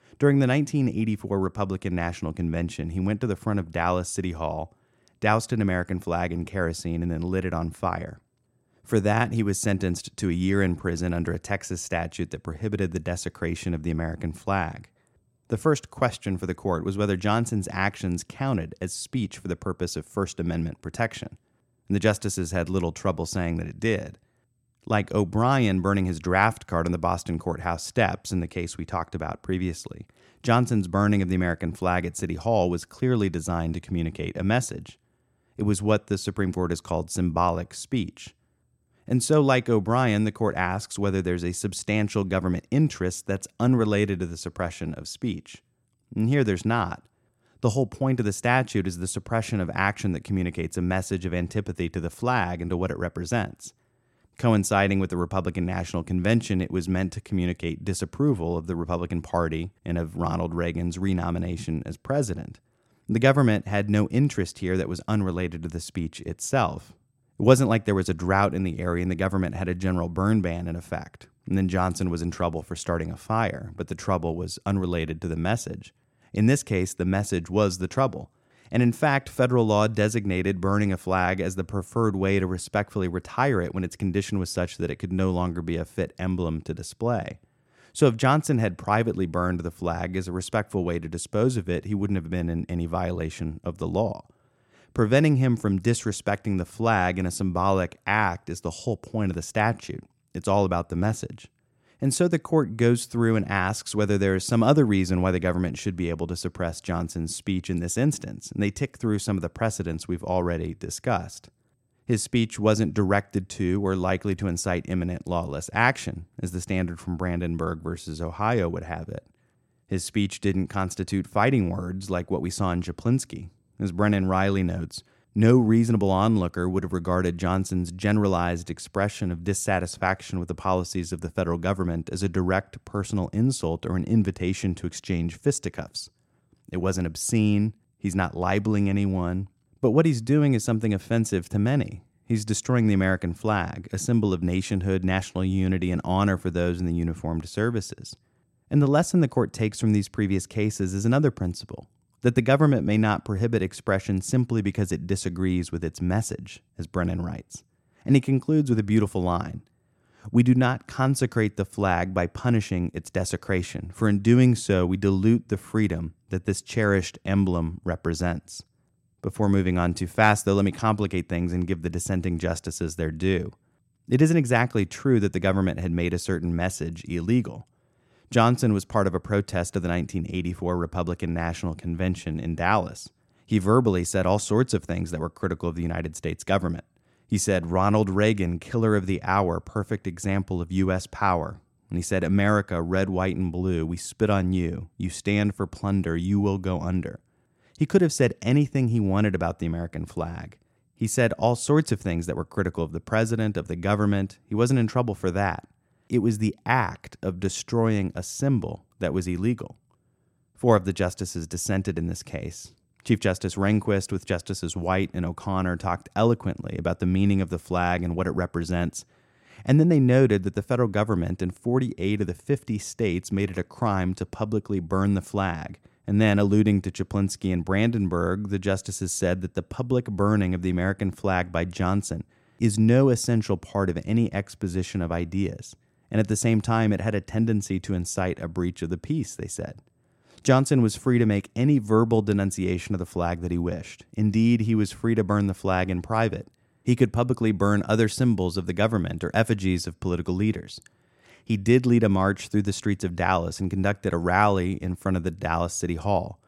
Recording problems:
none

